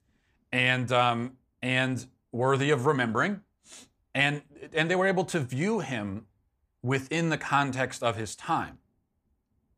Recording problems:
none

